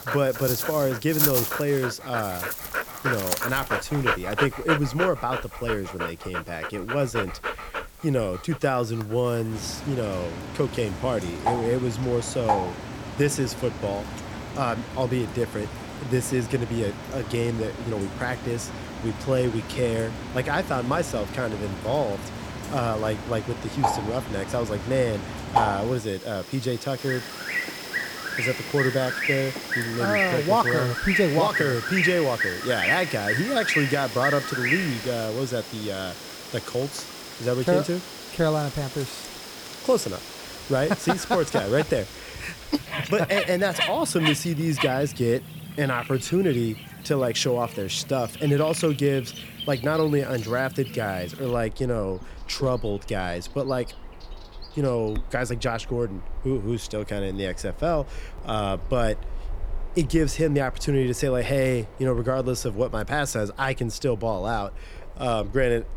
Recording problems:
animal sounds; loud; throughout; 4 dB below the speech

